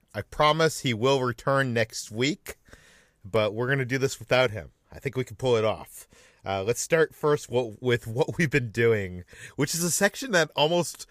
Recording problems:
none

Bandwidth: 15 kHz